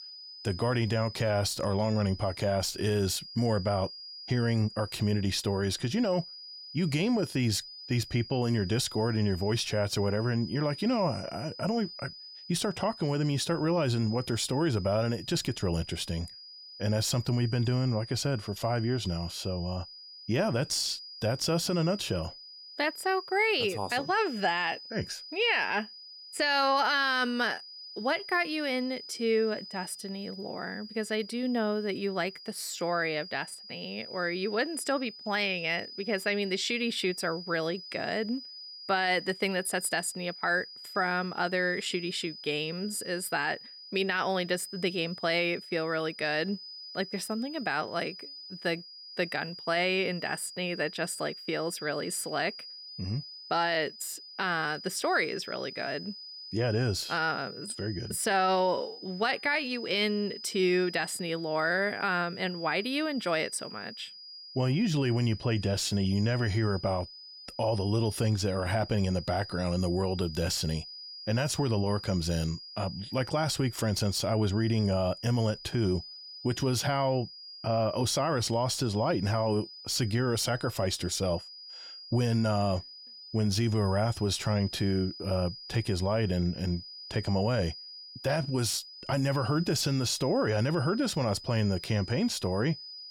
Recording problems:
high-pitched whine; noticeable; throughout; 5 kHz, 15 dB below the speech

